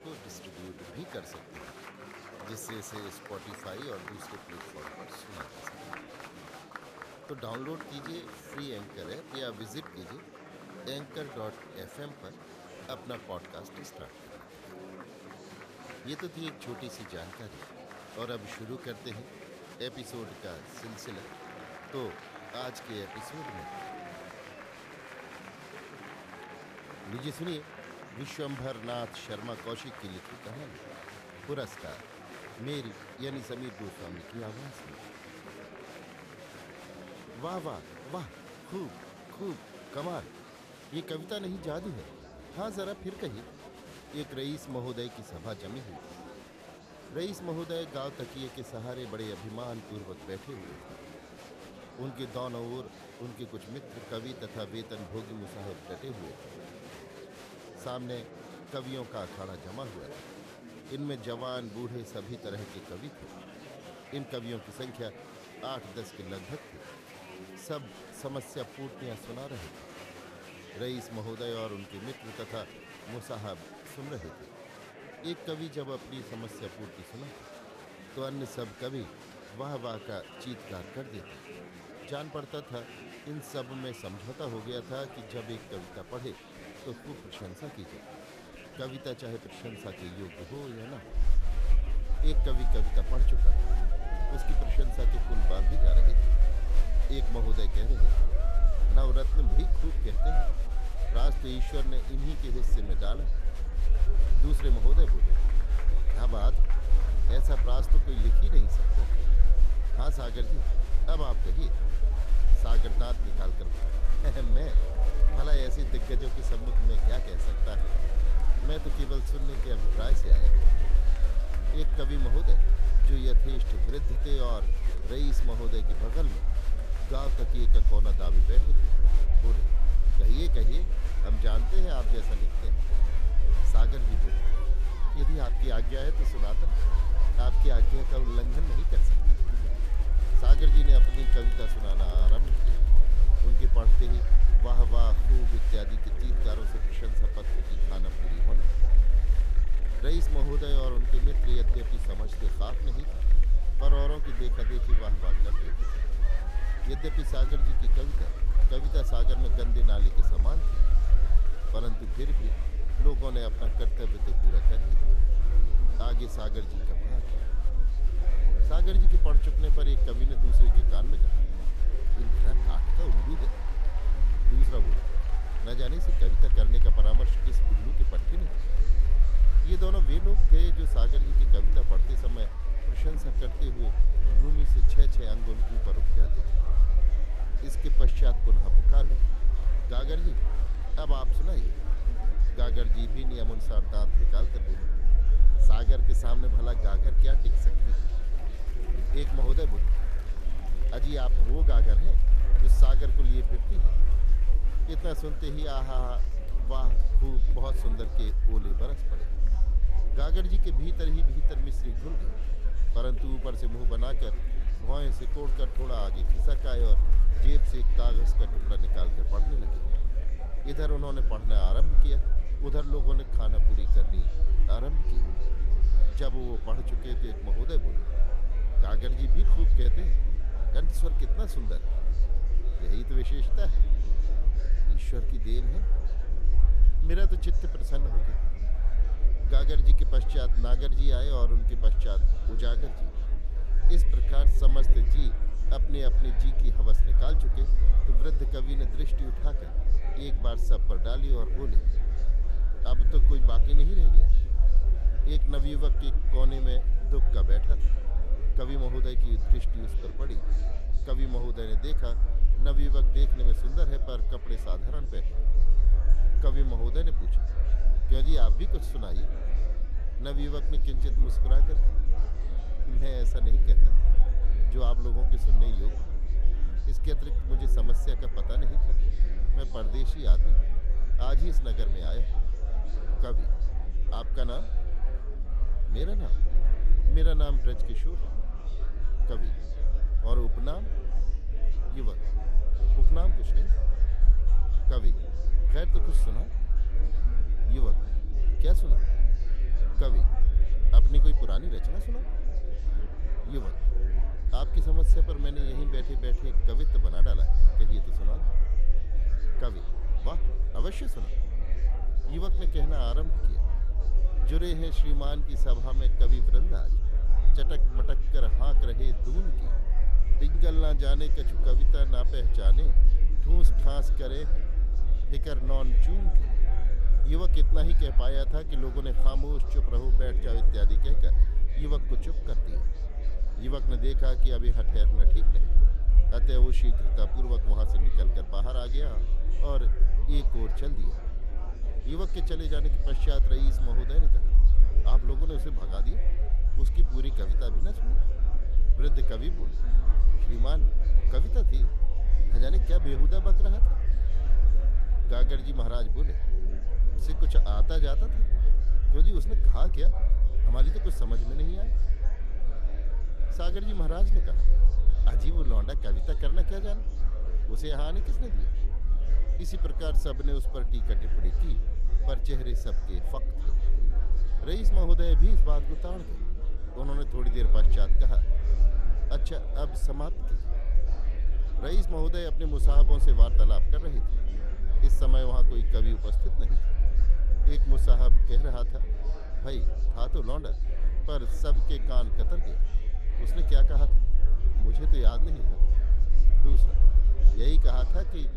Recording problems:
murmuring crowd; loud; throughout; 7 dB below the speech
low rumble; noticeable; from 1:31 on; 10 dB below the speech

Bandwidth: 14.5 kHz